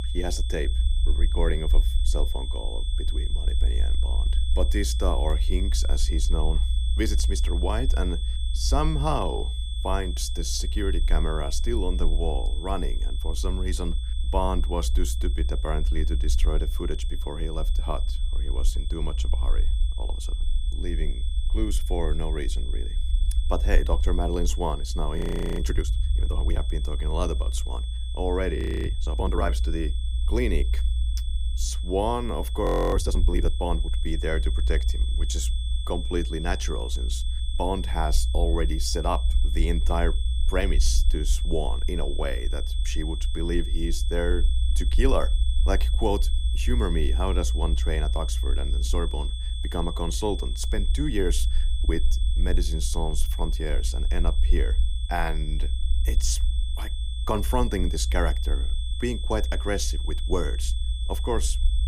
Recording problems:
high-pitched whine; loud; throughout; 3.5 kHz, 10 dB below the speech
low rumble; noticeable; throughout; 15 dB below the speech
audio freezing; at 25 s, at 29 s and at 33 s

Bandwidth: 15.5 kHz